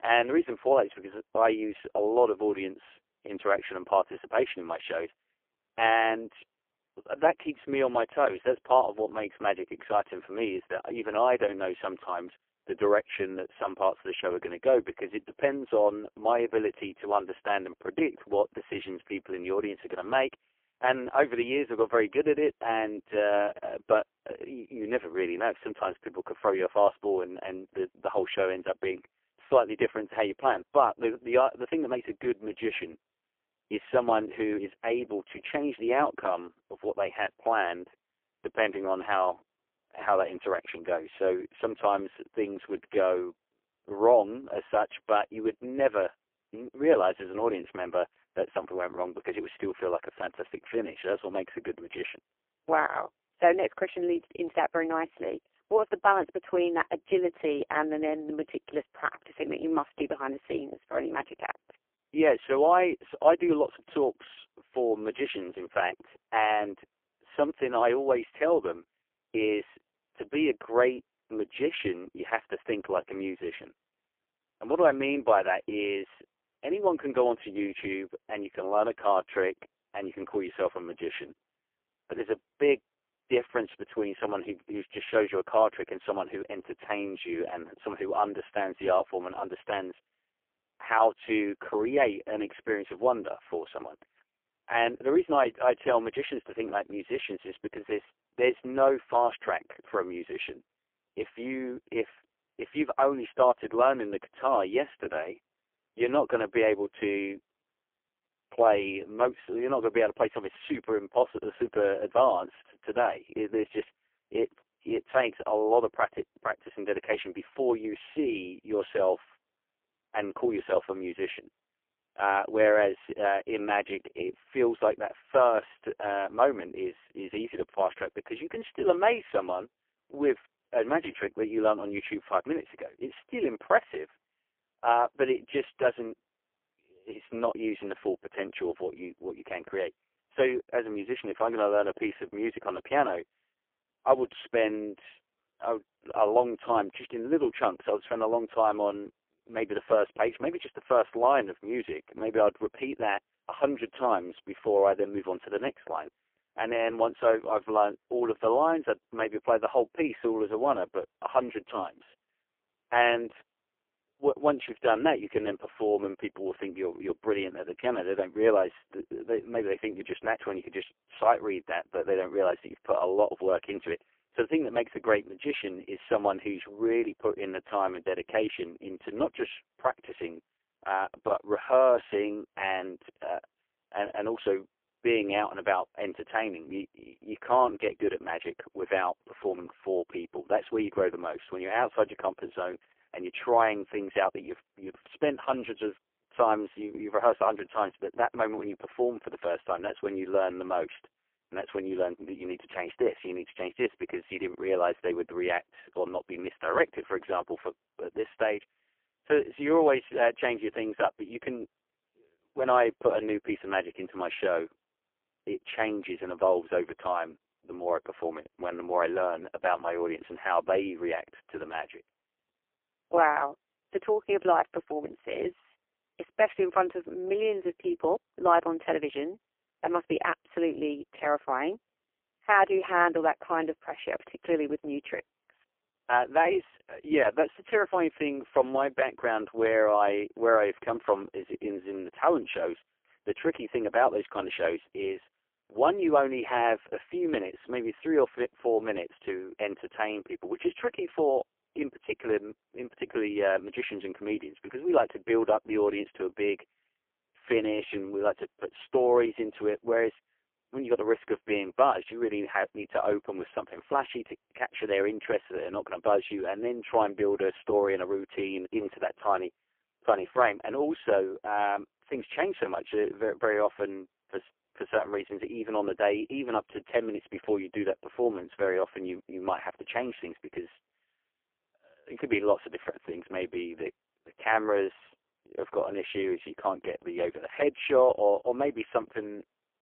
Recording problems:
phone-call audio; poor line; nothing above 3 kHz

